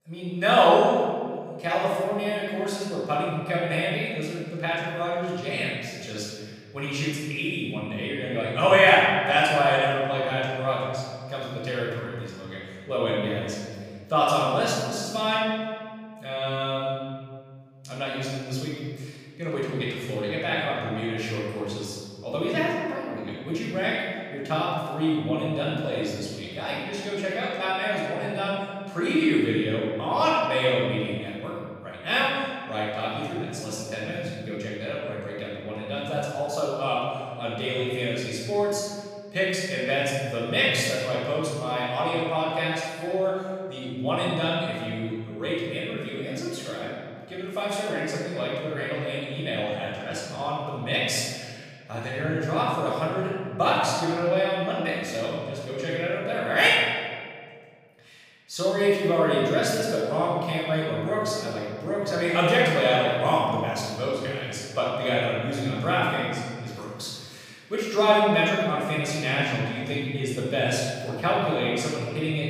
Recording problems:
room echo; strong; dies away in 1.8 s
off-mic speech; far

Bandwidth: 15 kHz